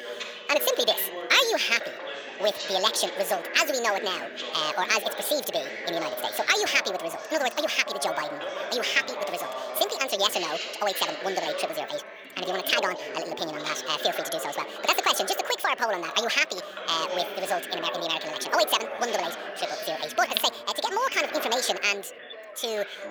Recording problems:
thin; very; fading below 550 Hz
wrong speed and pitch; too fast and too high; 1.7 times normal speed
background chatter; loud; throughout; 4 voices, 9 dB below the speech

